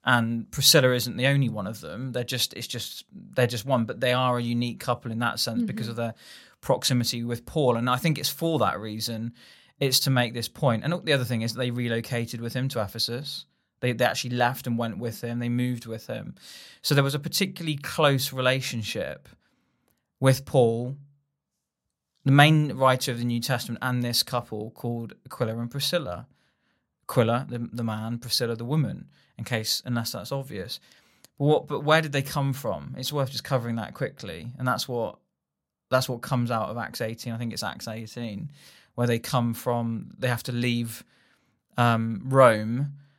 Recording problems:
none

